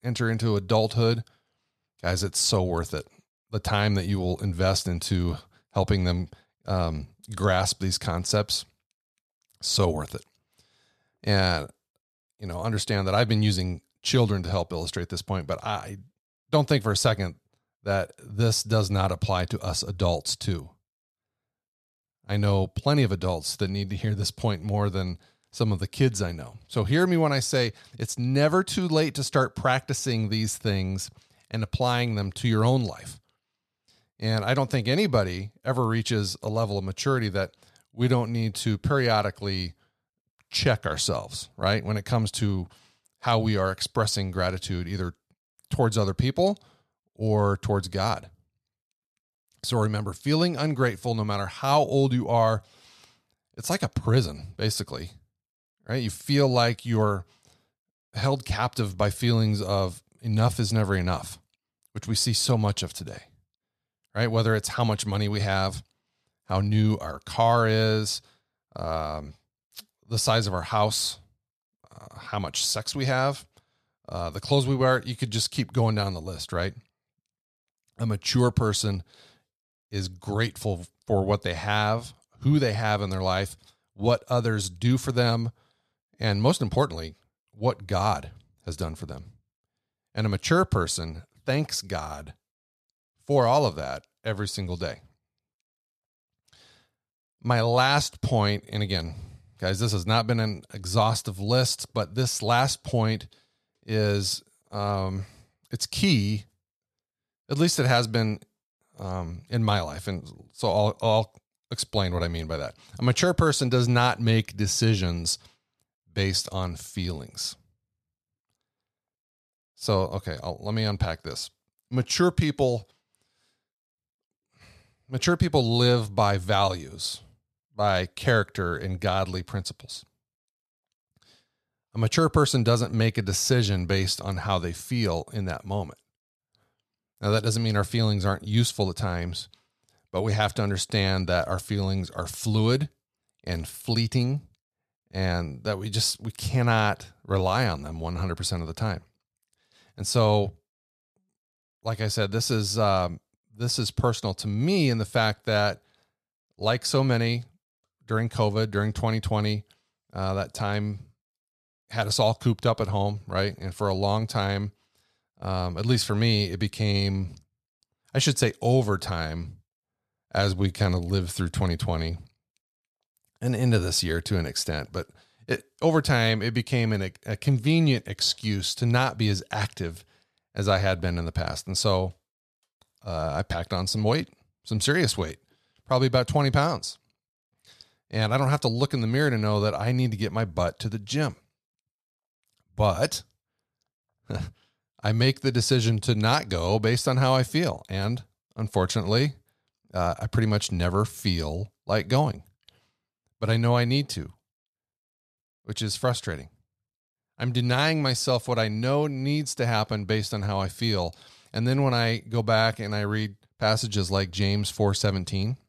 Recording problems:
none

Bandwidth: 14 kHz